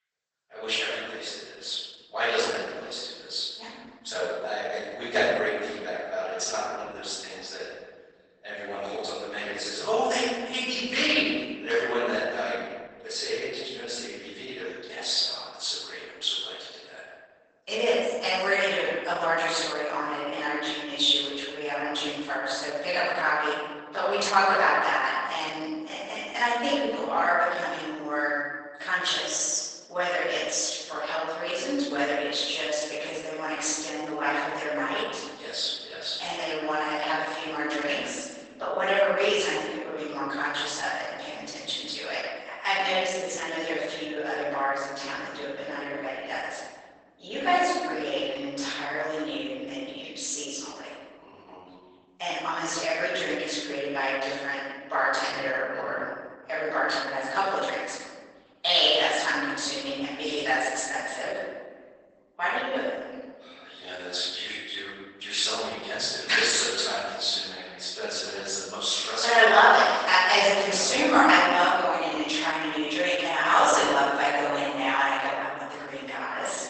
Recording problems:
room echo; strong; dies away in 1.5 s
off-mic speech; far
garbled, watery; badly; nothing above 8 kHz
thin; somewhat; fading below 700 Hz

